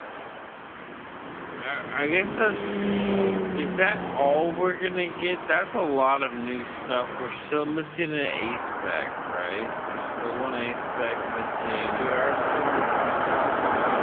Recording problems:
wrong speed, natural pitch; too slow; 0.5 times normal speed
phone-call audio; nothing above 3.5 kHz
traffic noise; loud; throughout; 2 dB below the speech

